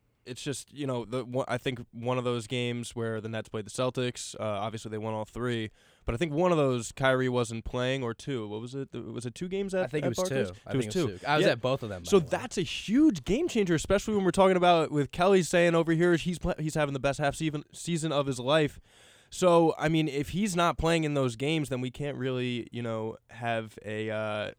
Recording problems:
none

